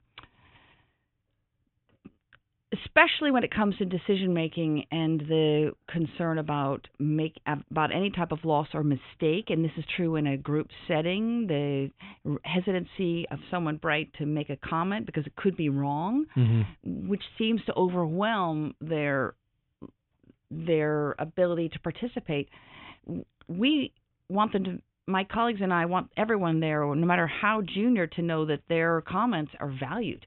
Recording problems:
high frequencies cut off; severe; nothing above 3.5 kHz

